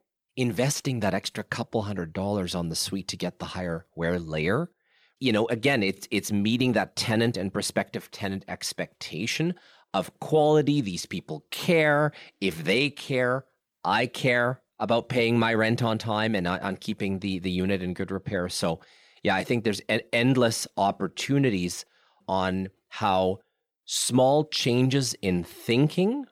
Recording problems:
none

